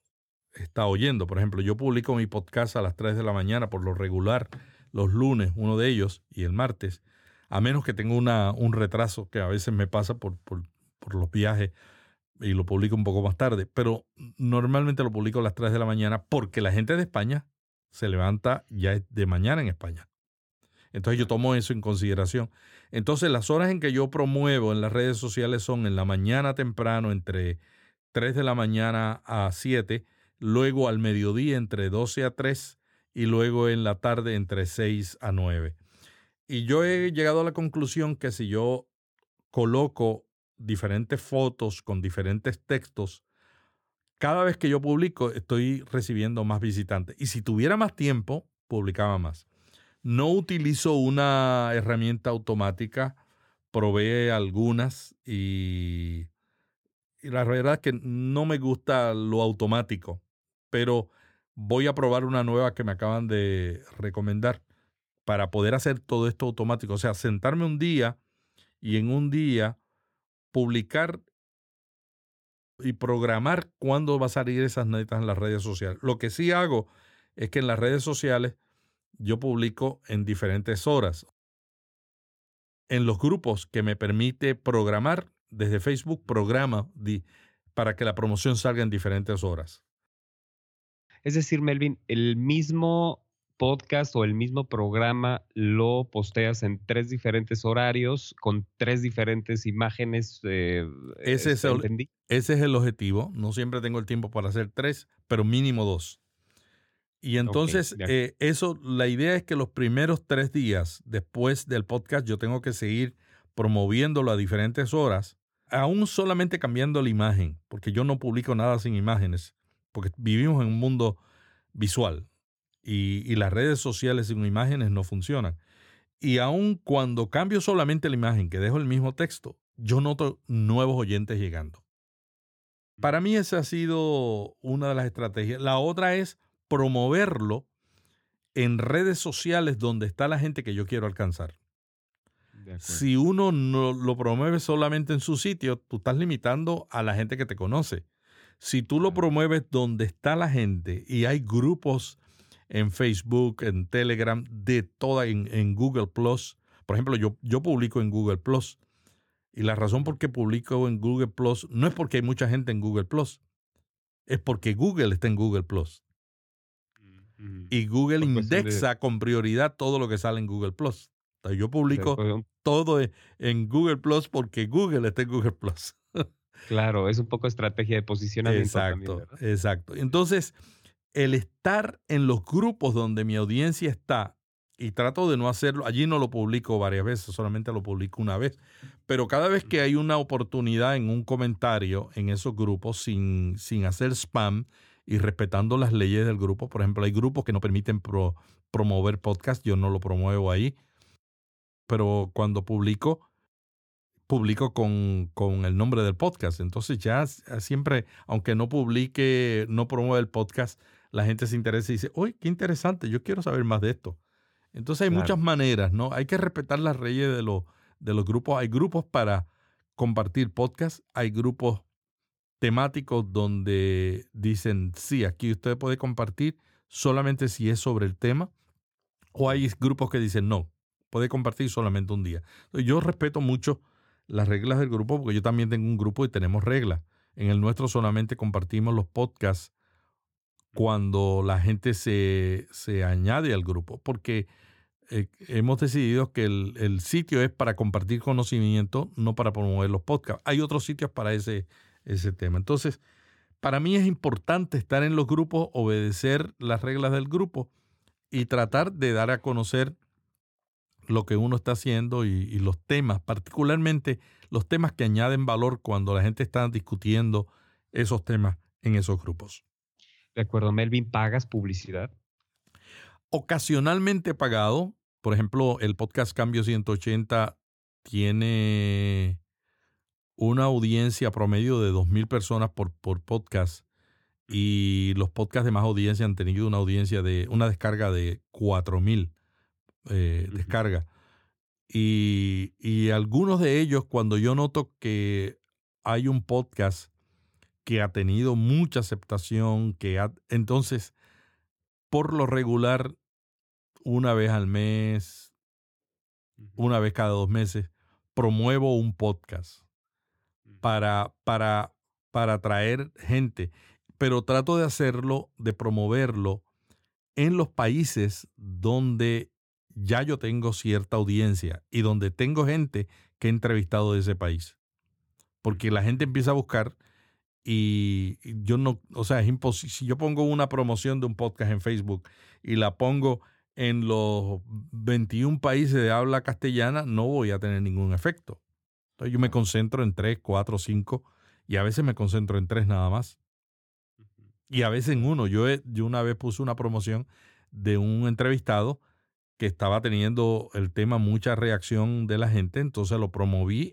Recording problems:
uneven, jittery; strongly; from 42 s to 4:46

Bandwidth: 17.5 kHz